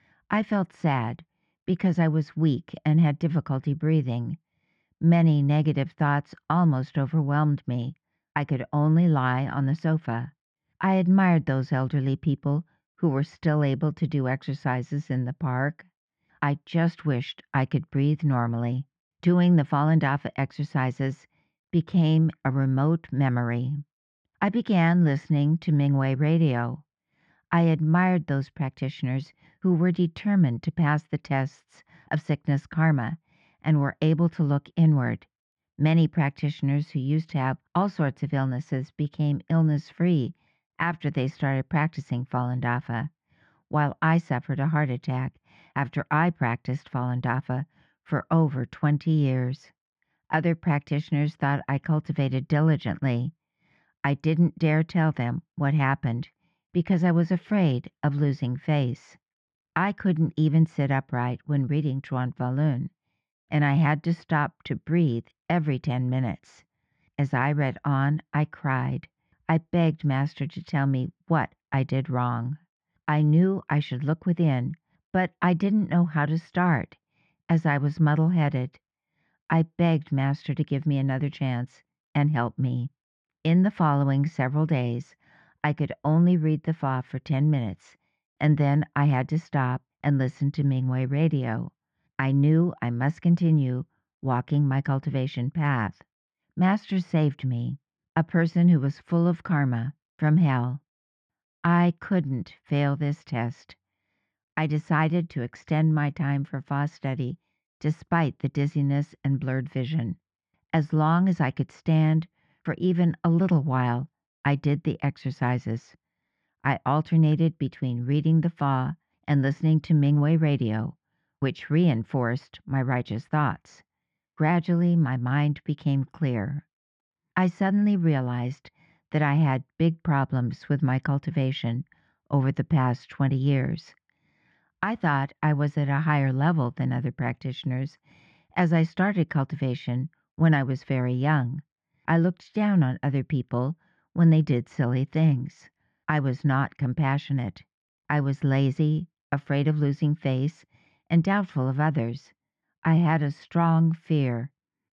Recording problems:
muffled; very; fading above 2.5 kHz

